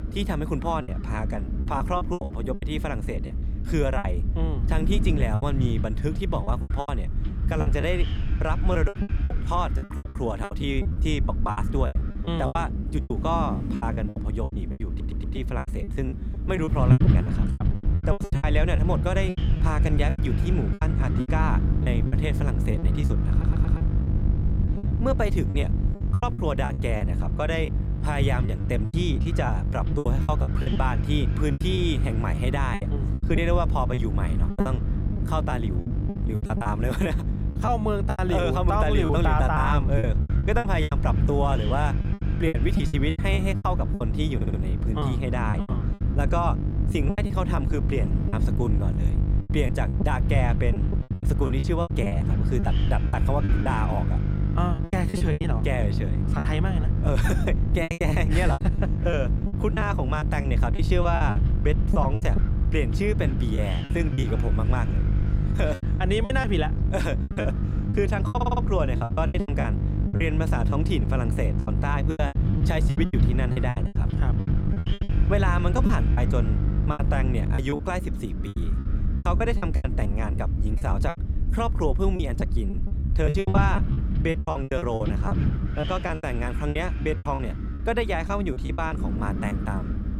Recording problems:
electrical hum; loud; from 18 s to 1:18; 50 Hz, 9 dB below the speech
wind noise on the microphone; occasional gusts; 10 dB below the speech
low rumble; noticeable; throughout; 20 dB below the speech
choppy; very; 14% of the speech affected
audio stuttering; 4 times, first at 15 s

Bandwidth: 18.5 kHz